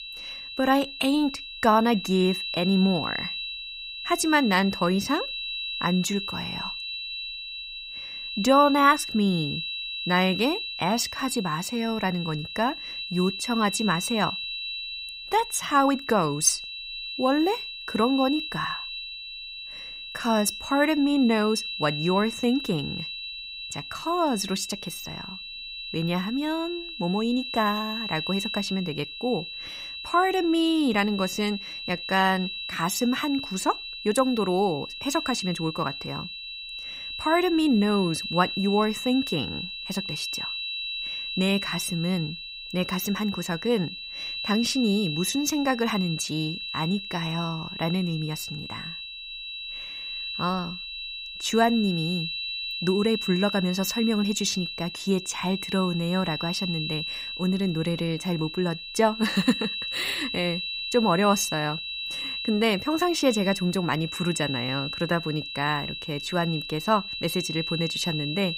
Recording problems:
high-pitched whine; loud; throughout; 4 kHz, 6 dB below the speech

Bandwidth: 15.5 kHz